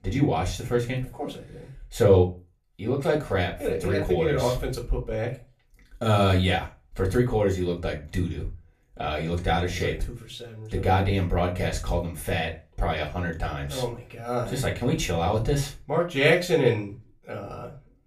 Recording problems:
off-mic speech; far
room echo; very slight; dies away in 0.2 s

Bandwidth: 14.5 kHz